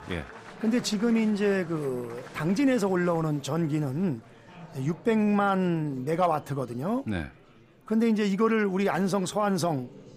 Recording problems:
murmuring crowd; noticeable; throughout; 20 dB below the speech

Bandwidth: 15 kHz